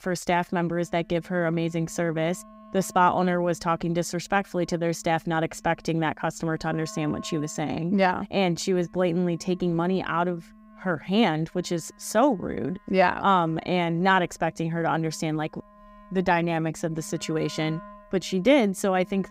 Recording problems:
background music; faint; throughout; 25 dB below the speech

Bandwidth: 15.5 kHz